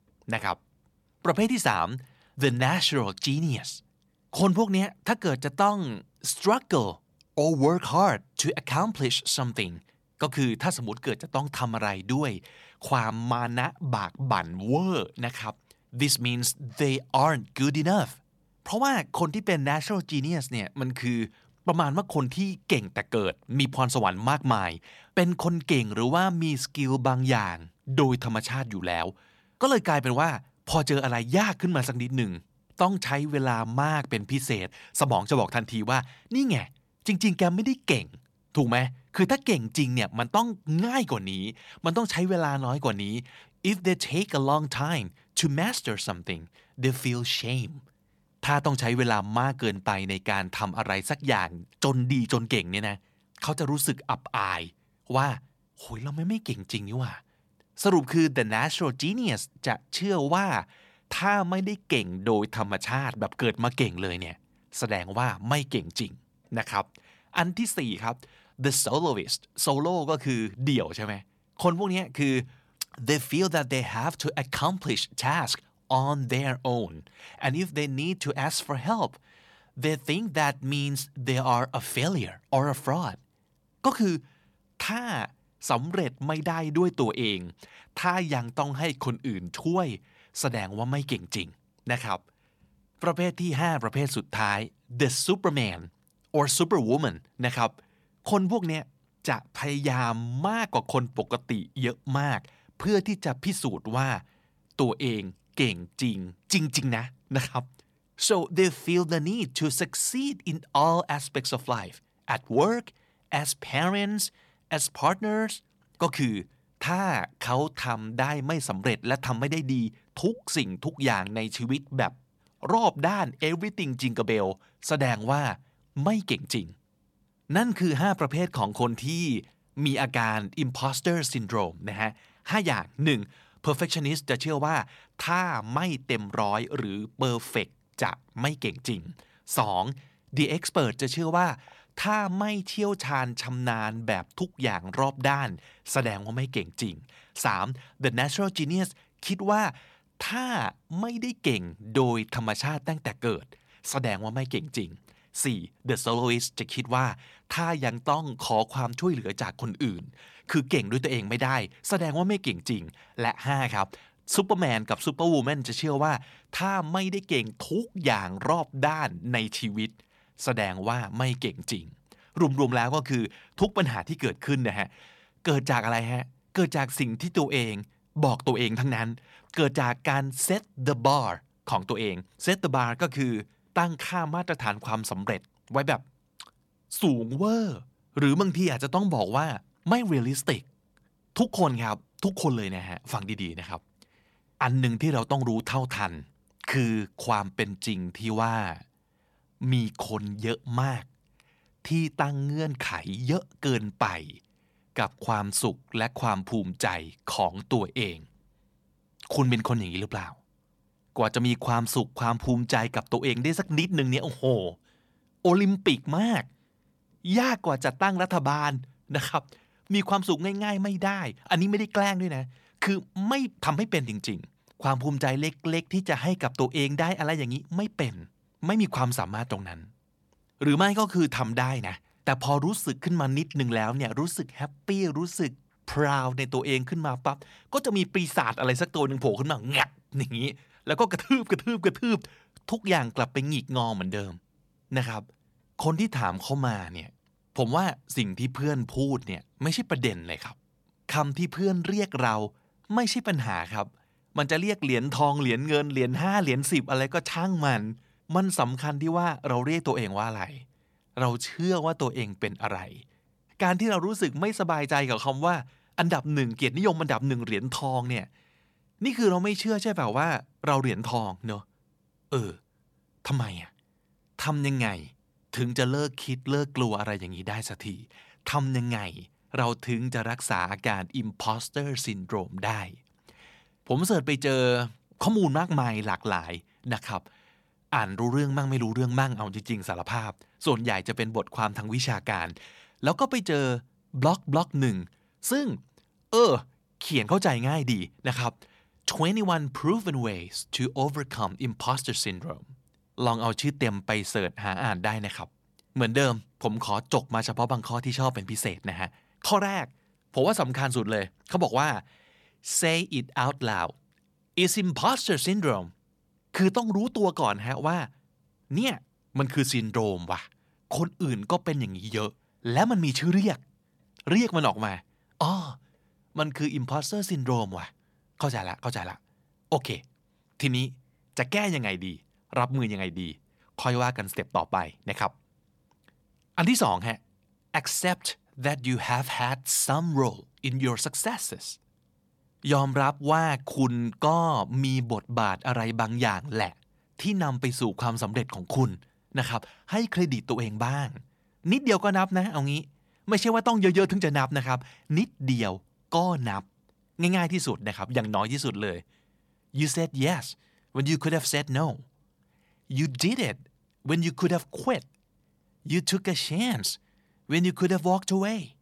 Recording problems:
none

